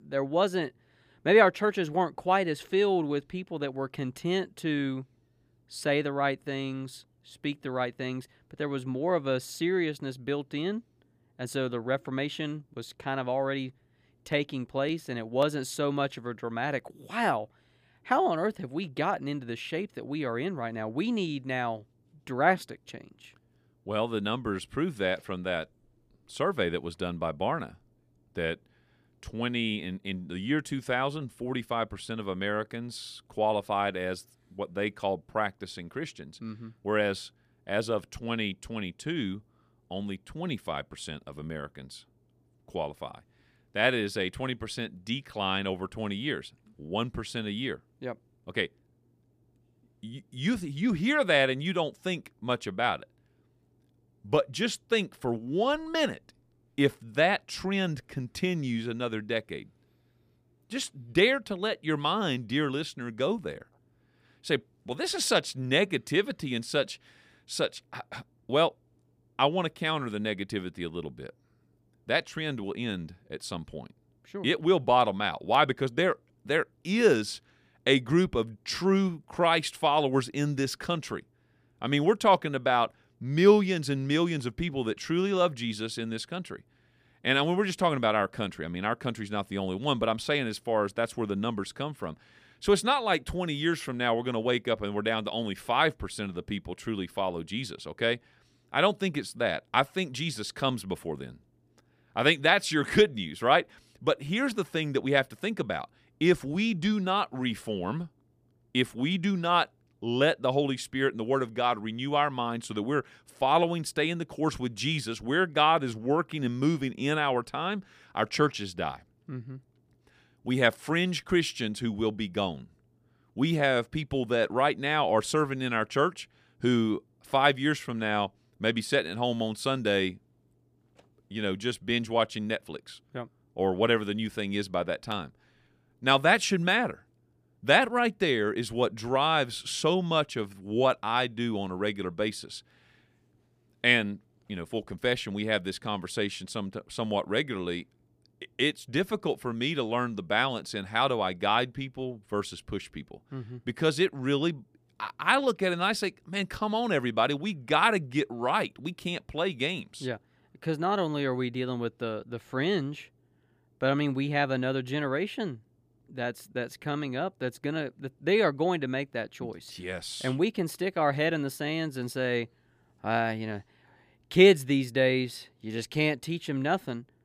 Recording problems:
none

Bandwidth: 15 kHz